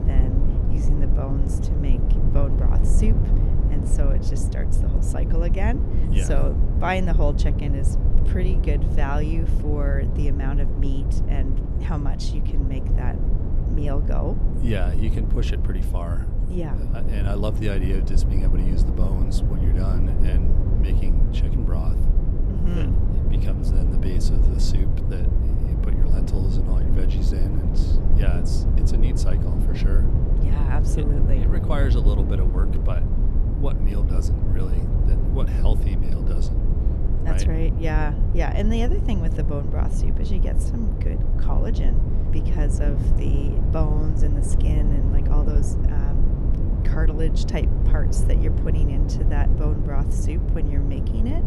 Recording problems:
low rumble; loud; throughout; 2 dB below the speech

